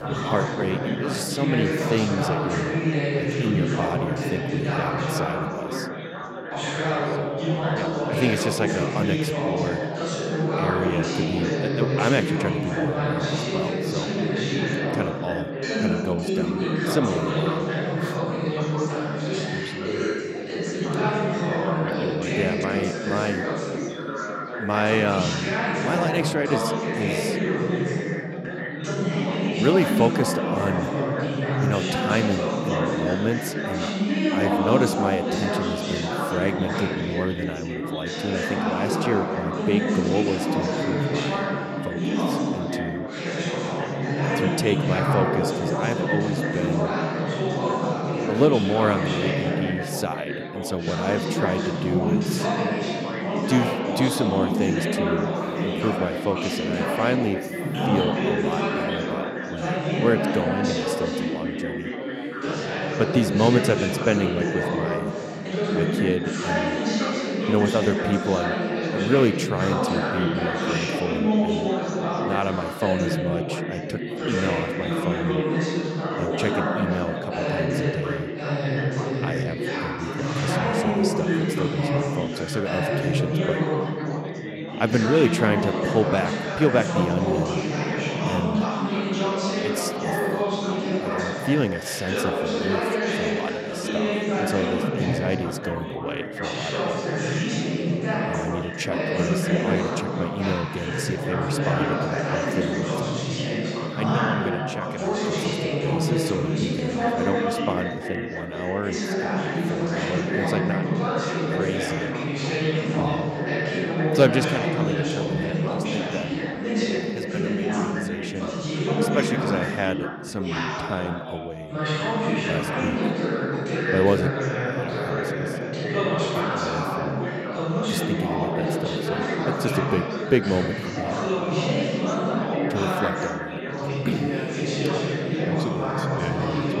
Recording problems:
chatter from many people; very loud; throughout; 3 dB above the speech

